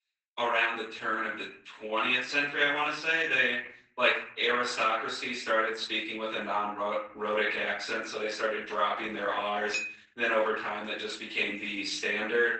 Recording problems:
off-mic speech; far
garbled, watery; badly; nothing above 8 kHz
room echo; noticeable; dies away in 0.5 s
thin; somewhat; fading below 500 Hz
clattering dishes; noticeable; at 9.5 s; peak 5 dB below the speech

